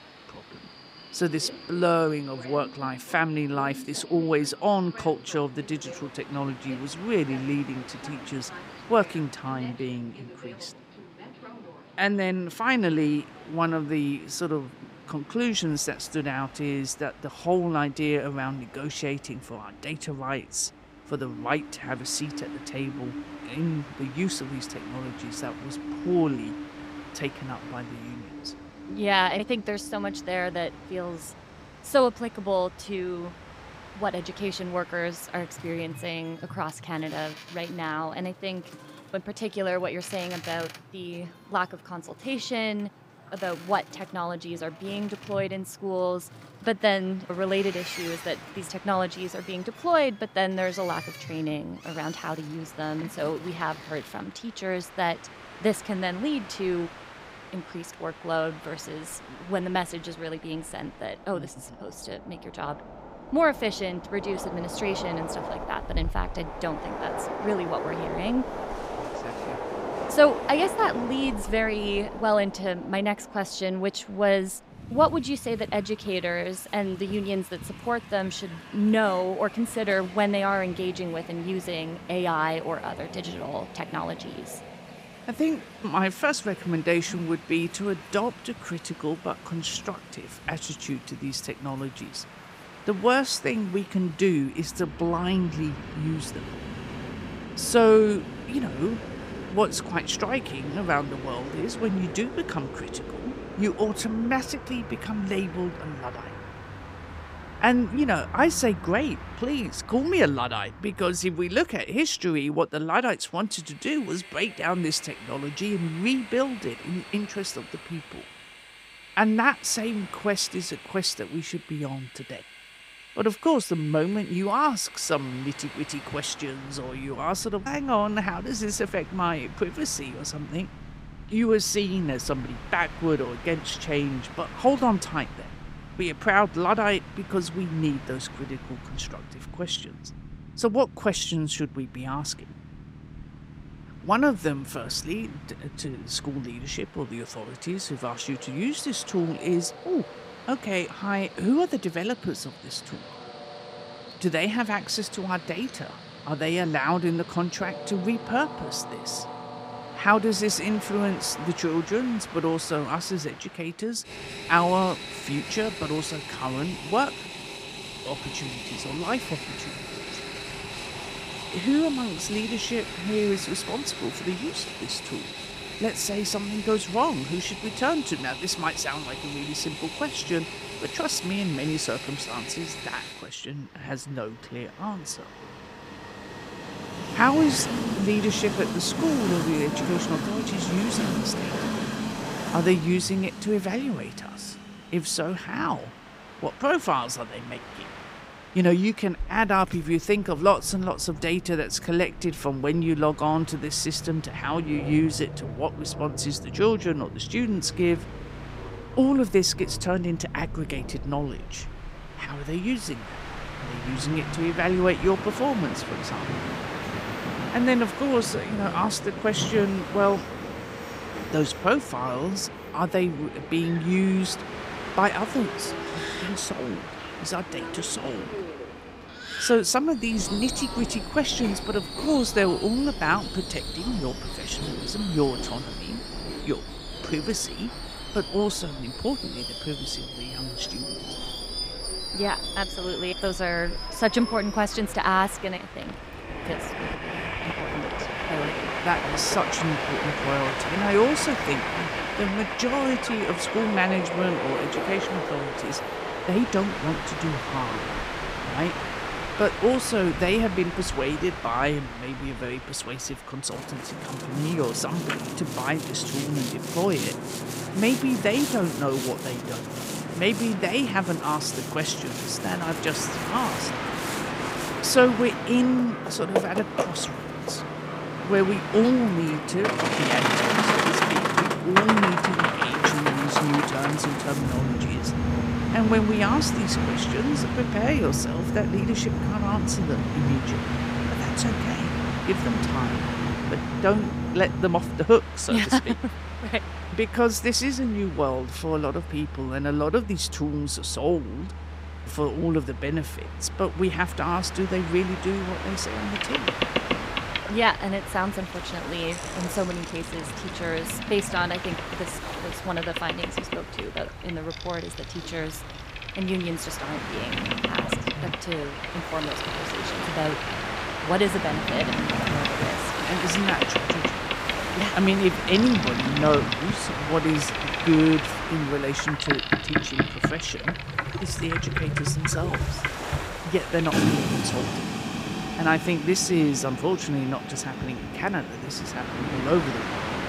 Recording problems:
train or aircraft noise; loud; throughout; 5 dB below the speech

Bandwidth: 15.5 kHz